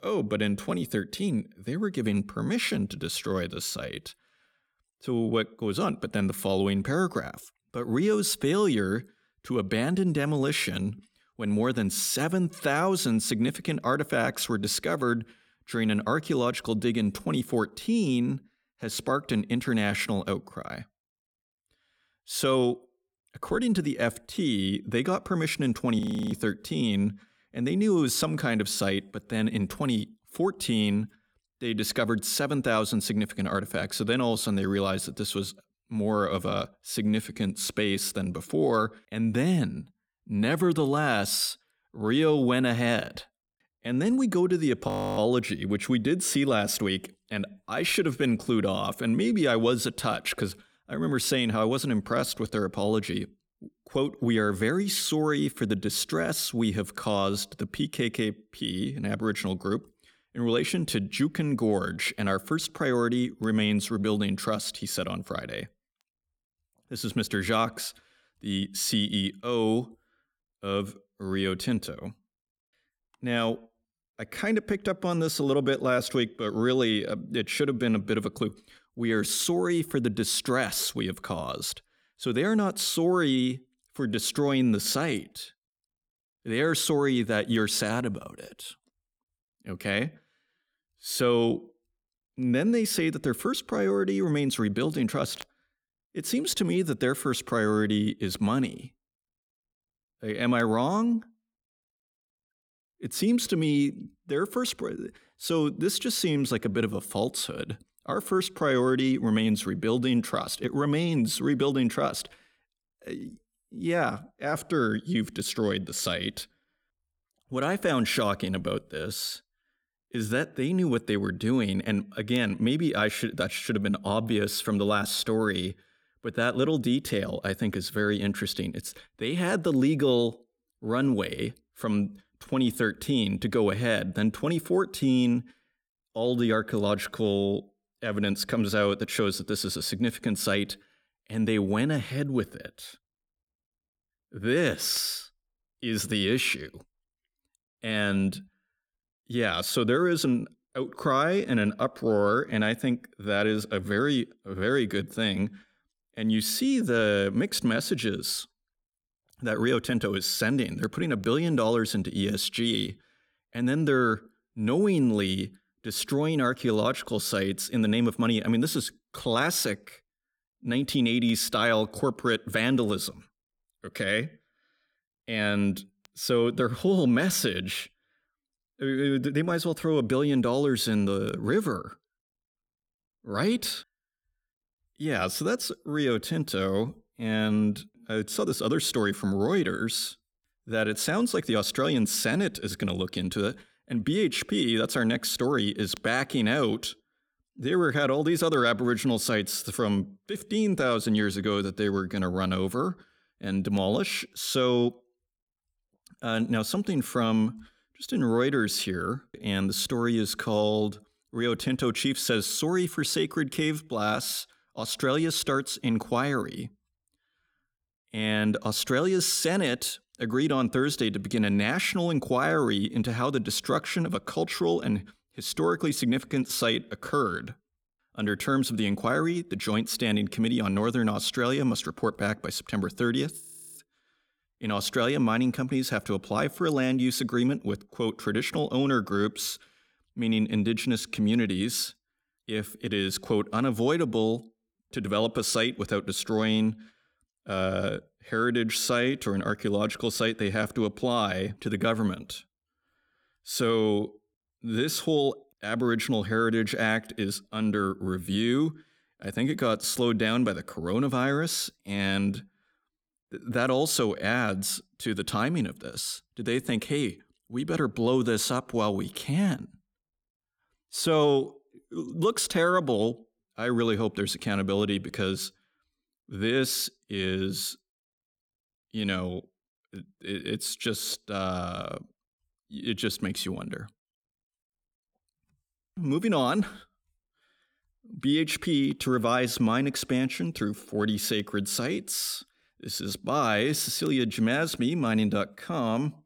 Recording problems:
audio freezing; at 26 s, at 45 s and at 3:53

